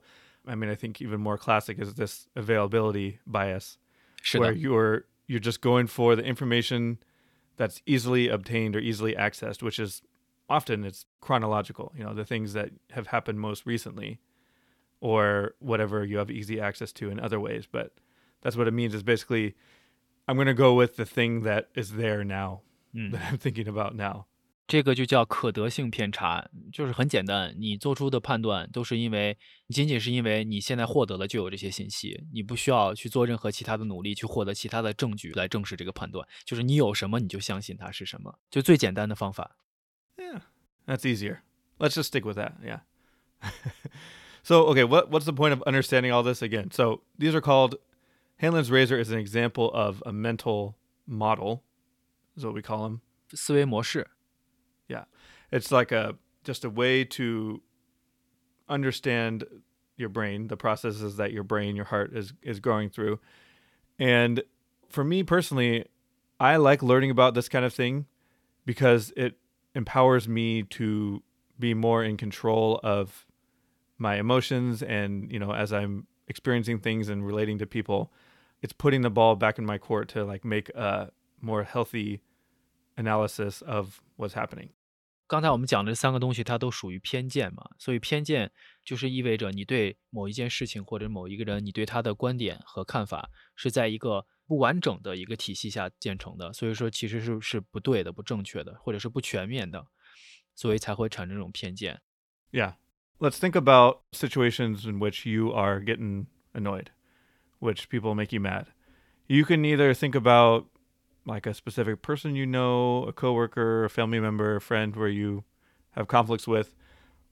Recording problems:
none

